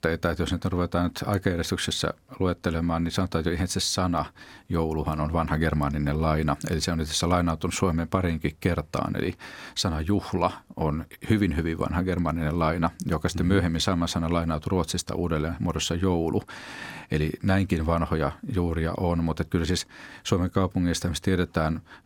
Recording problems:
none

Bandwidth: 17 kHz